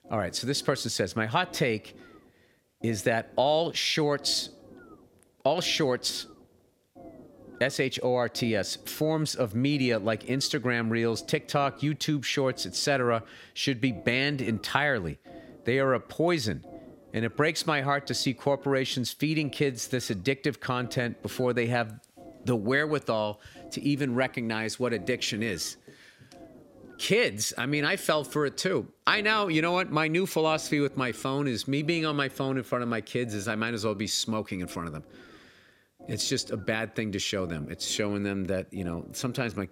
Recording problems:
low rumble; faint; throughout; 25 dB below the speech

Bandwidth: 16 kHz